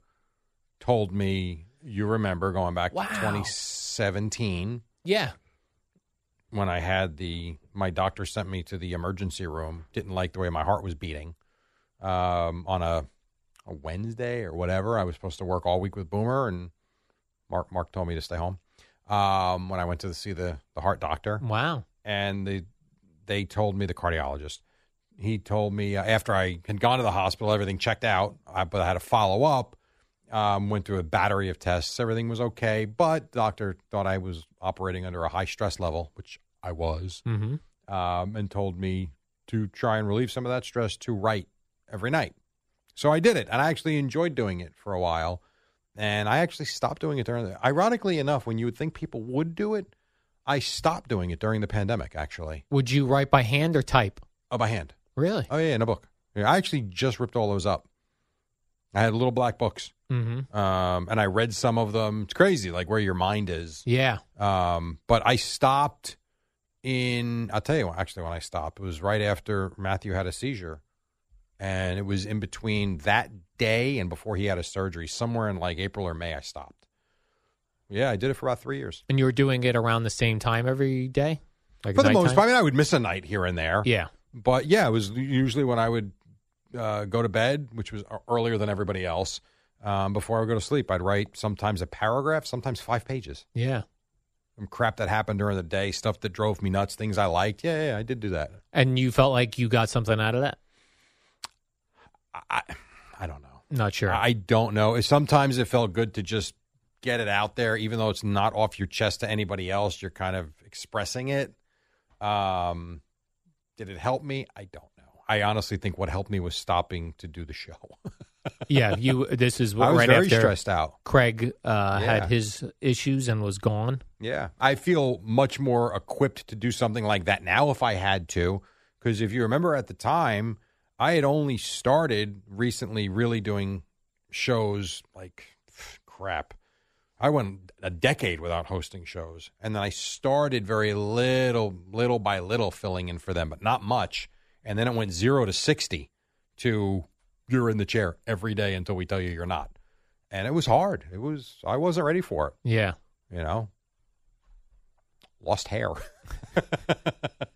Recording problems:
none

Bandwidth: 14.5 kHz